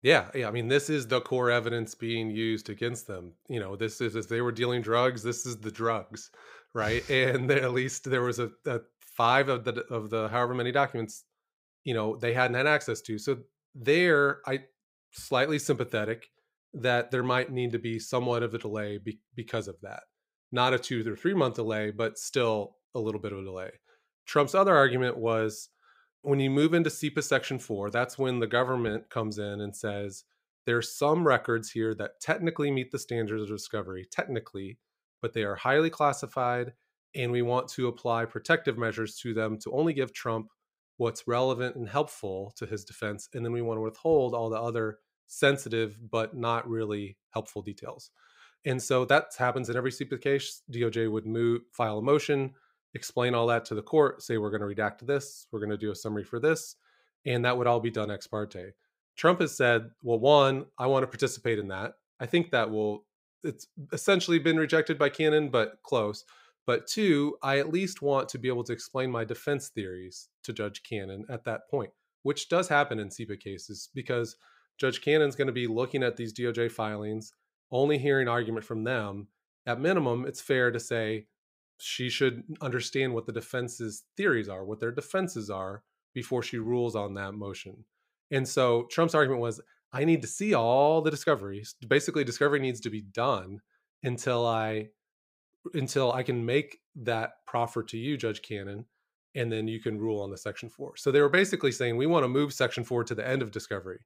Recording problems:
uneven, jittery; slightly; from 40 s to 1:31

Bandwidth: 15.5 kHz